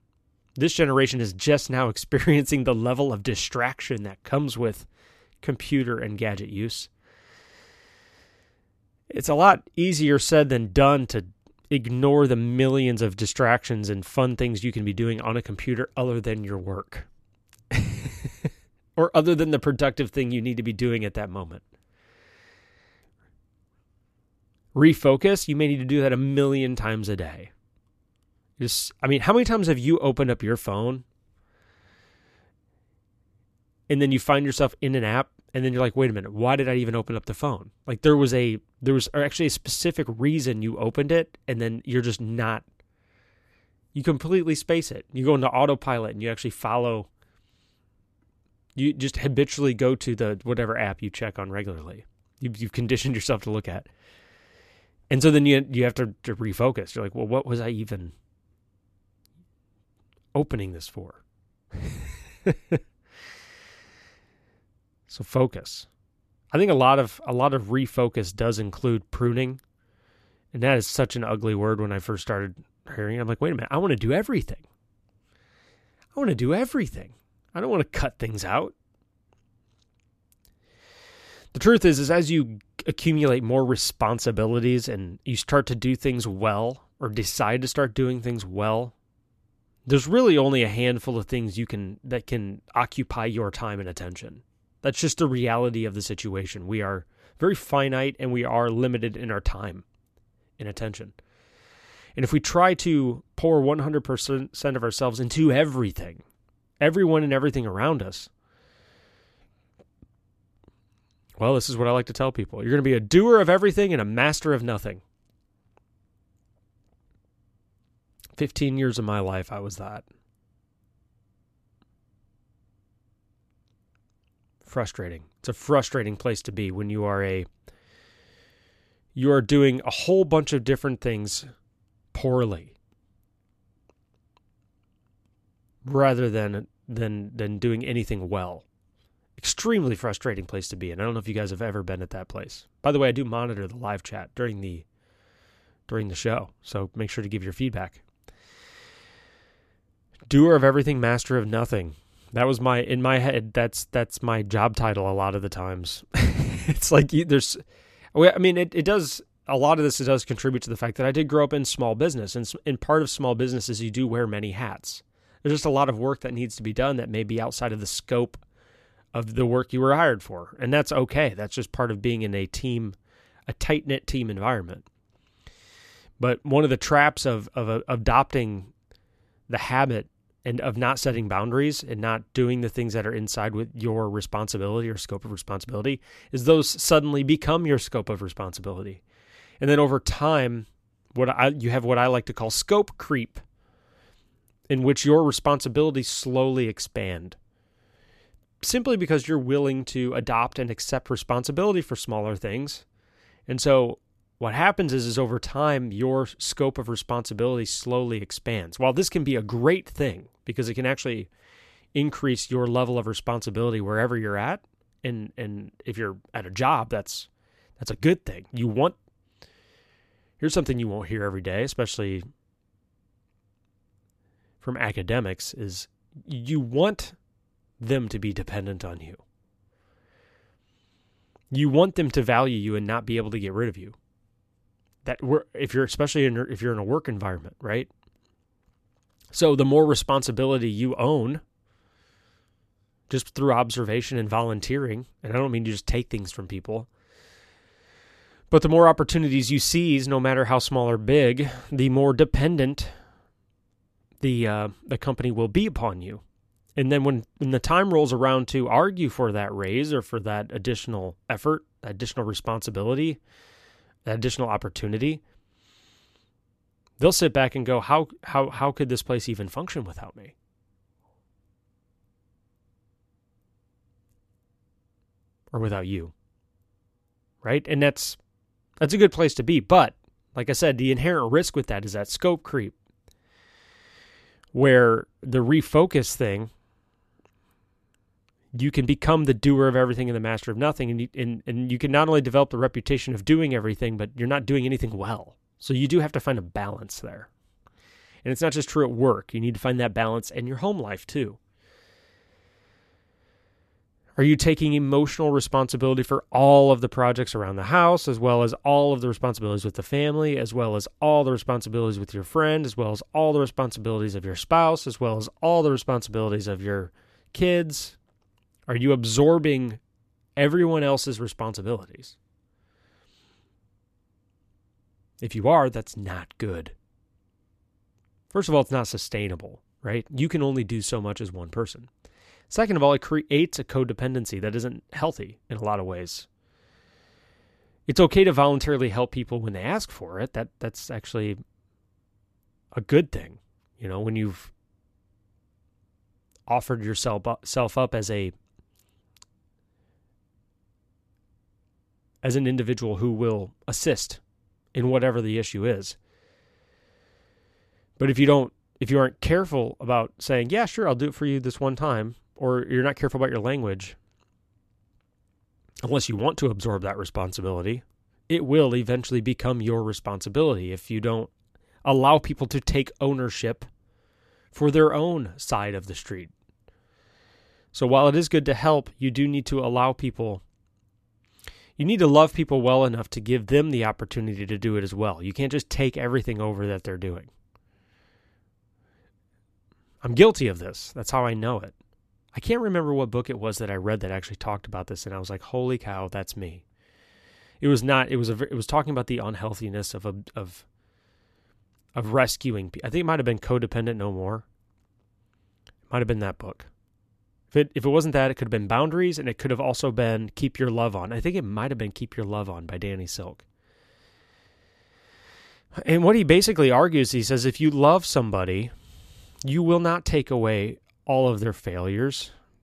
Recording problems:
none

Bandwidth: 14 kHz